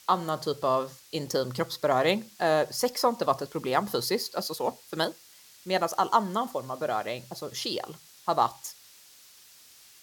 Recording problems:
hiss; faint; throughout; 20 dB below the speech

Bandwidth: 17.5 kHz